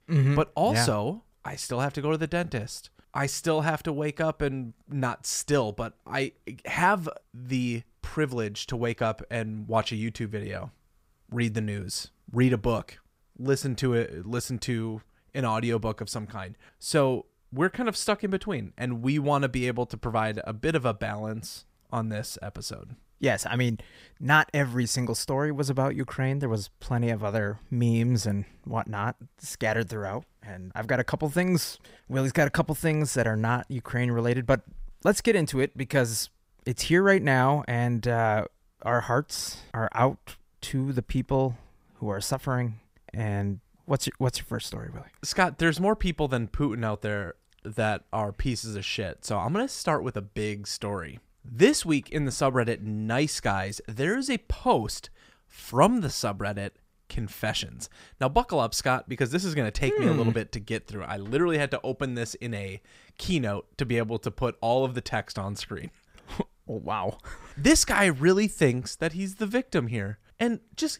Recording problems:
none

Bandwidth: 15.5 kHz